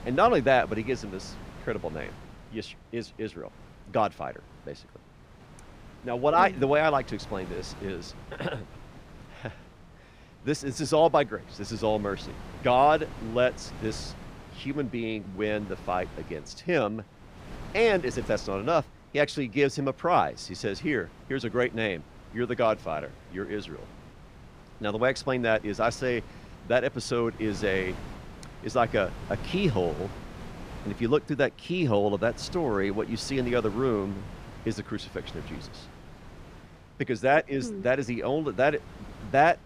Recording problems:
wind noise on the microphone; occasional gusts; 20 dB below the speech

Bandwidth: 15 kHz